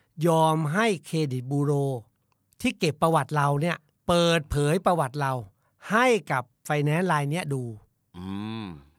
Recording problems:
none

